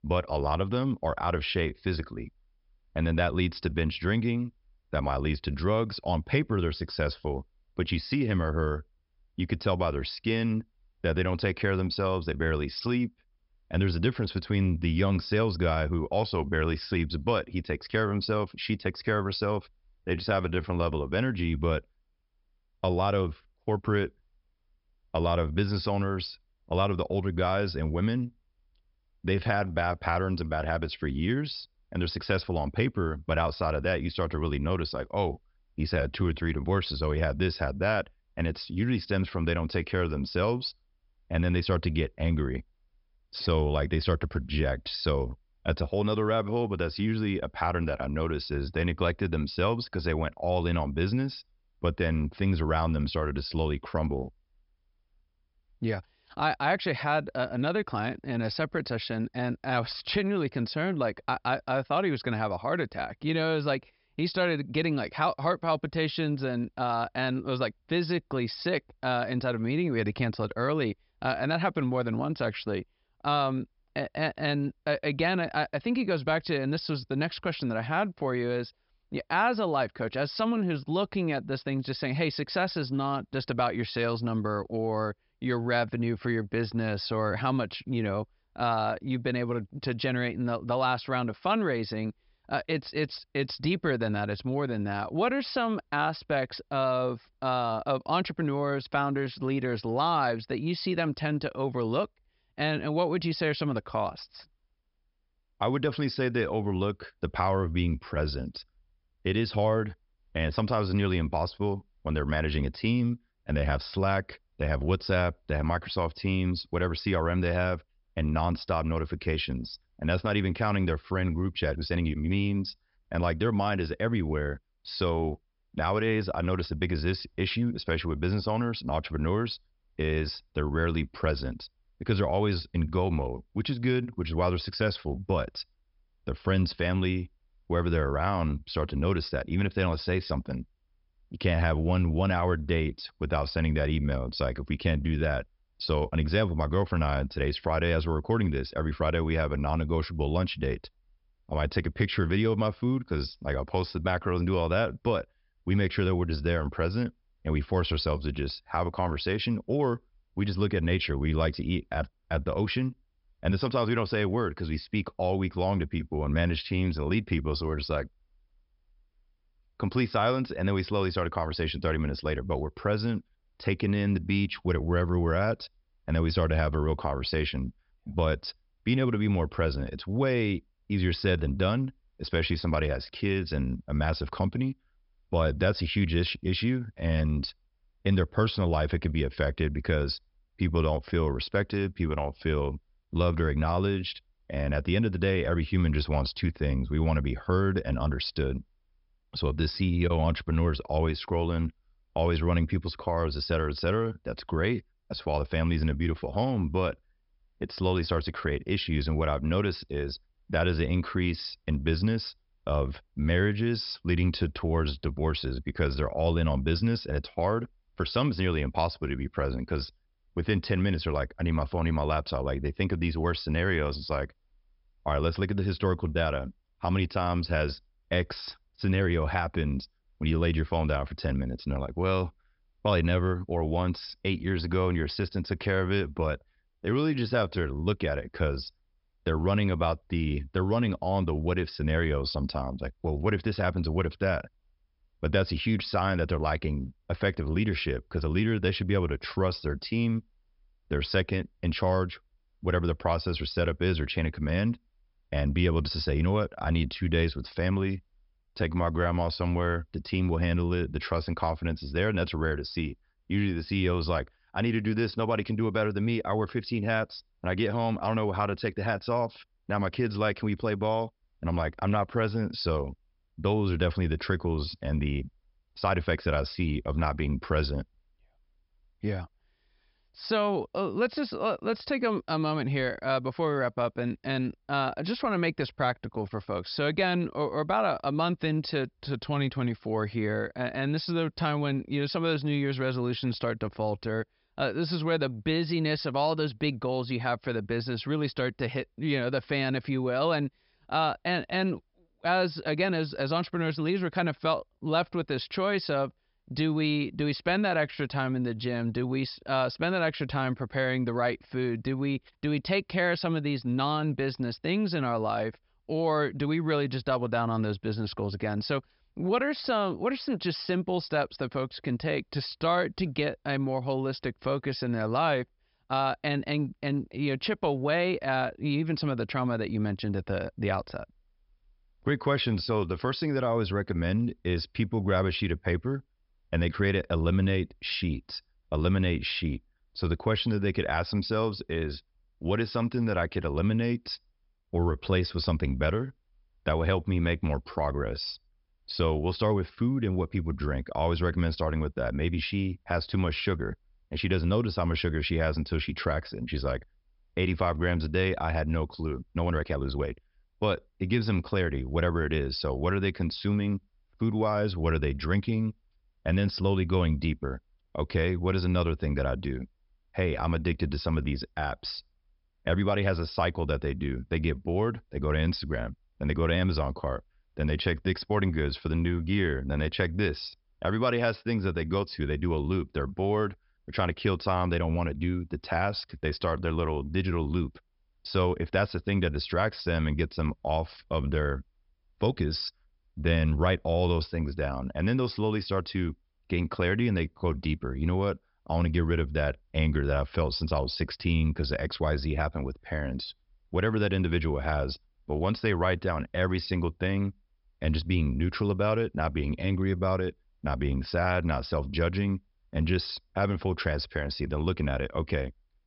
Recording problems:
high frequencies cut off; noticeable; nothing above 5.5 kHz
uneven, jittery; strongly; from 20 s to 6:00

